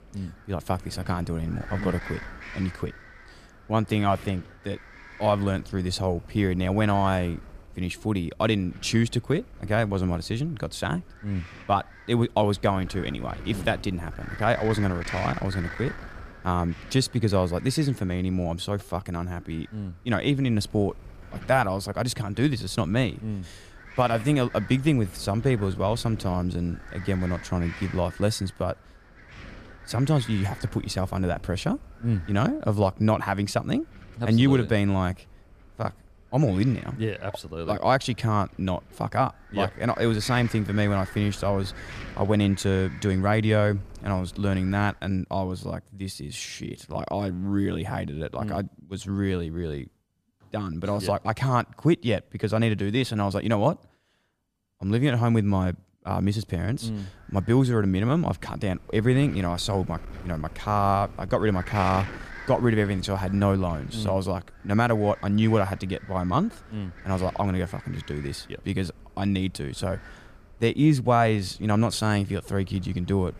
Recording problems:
wind noise on the microphone; occasional gusts; until 45 s and from 56 s on; 15 dB below the speech

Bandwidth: 14.5 kHz